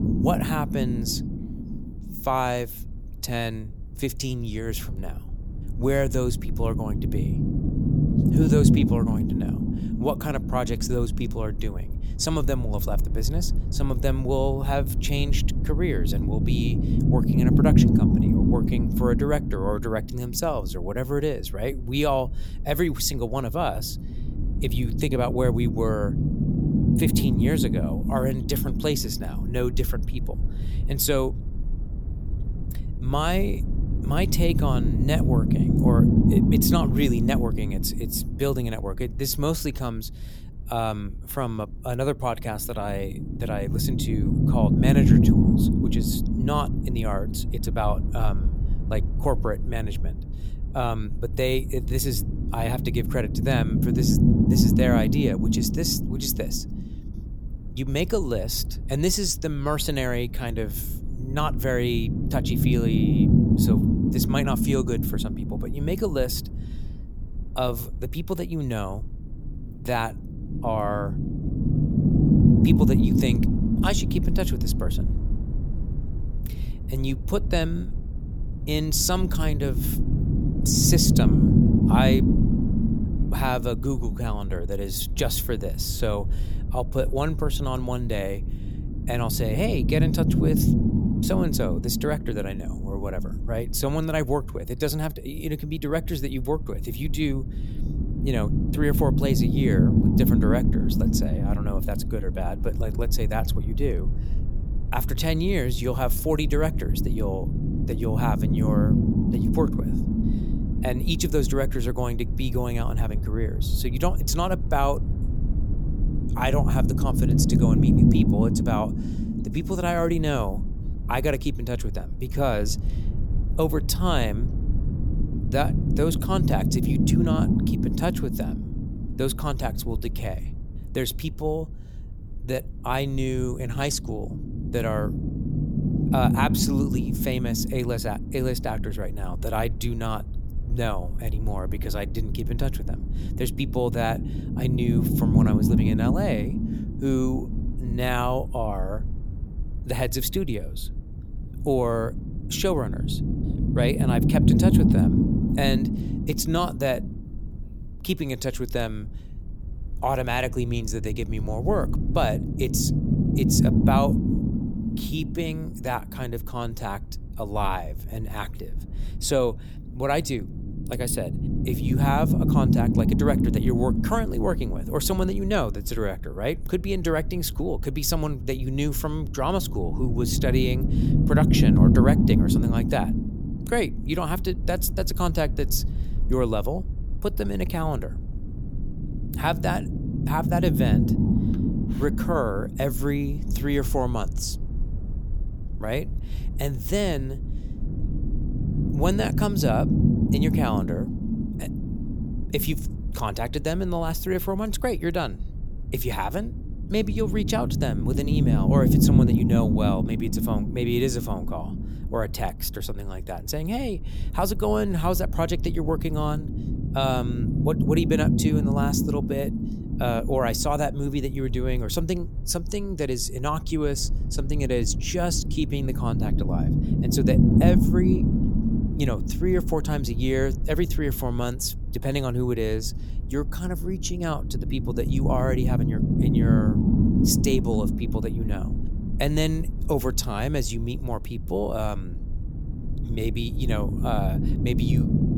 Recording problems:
low rumble; loud; throughout; 3 dB below the speech

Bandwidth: 18.5 kHz